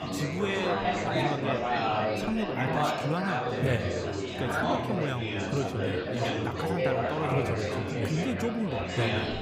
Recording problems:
chatter from many people; very loud; throughout; 3 dB above the speech

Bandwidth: 15.5 kHz